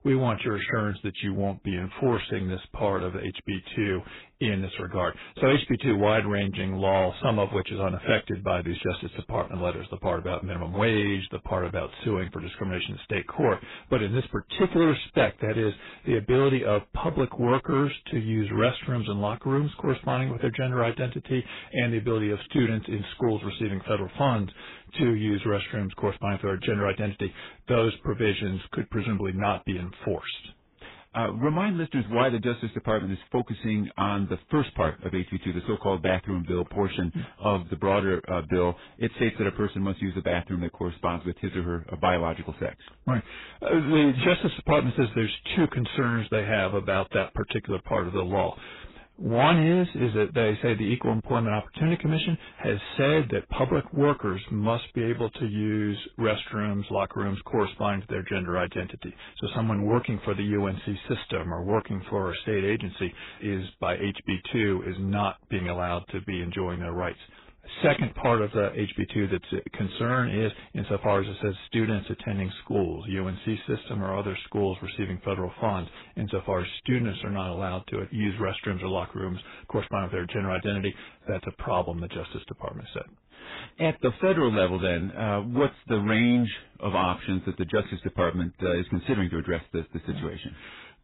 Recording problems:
garbled, watery; badly; nothing above 4 kHz
distortion; slight; 3% of the sound clipped

